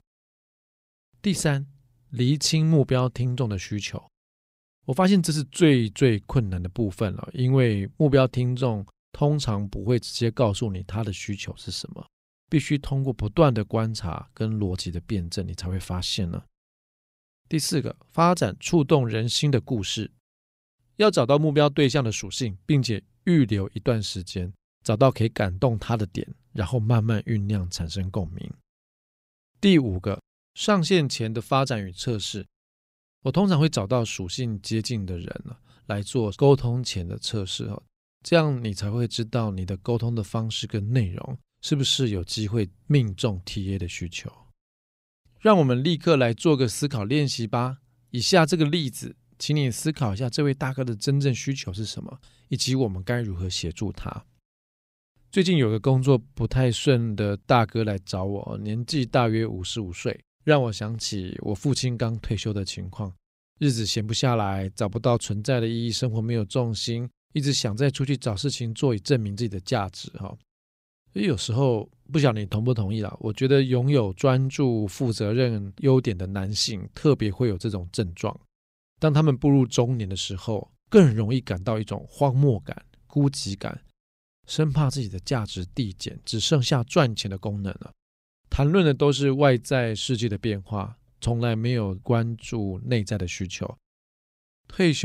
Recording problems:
abrupt cut into speech; at the end

